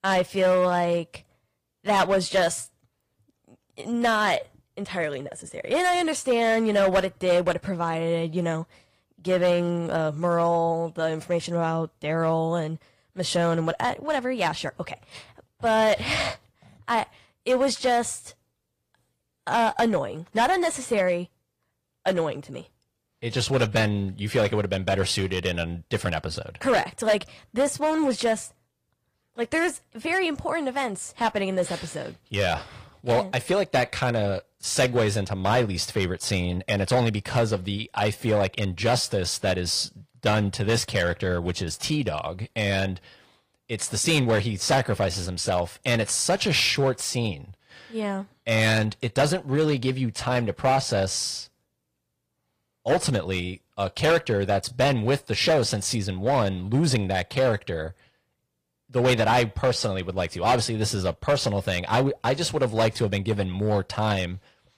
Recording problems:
distortion; slight; 4% of the sound clipped
garbled, watery; slightly; nothing above 15 kHz

